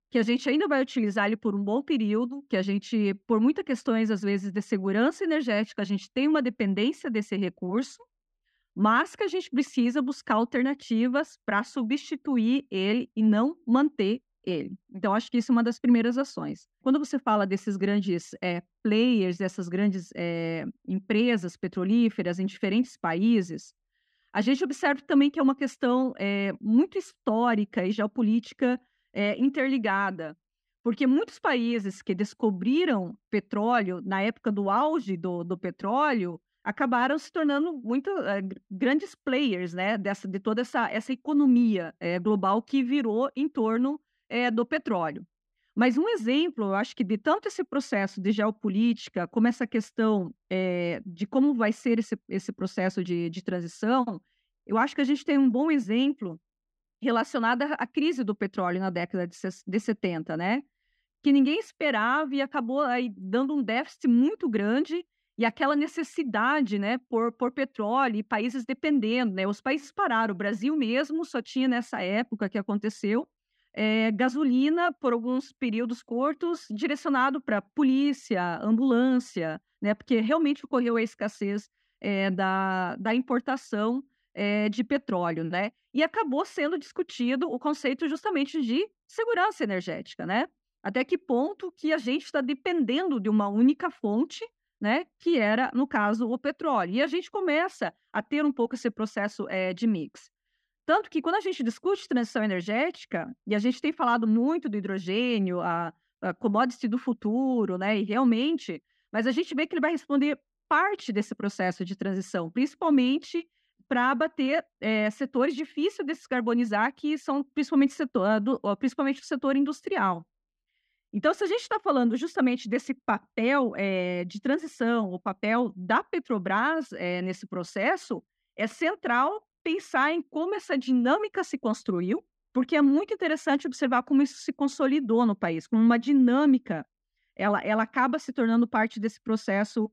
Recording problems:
muffled; slightly; fading above 3 kHz

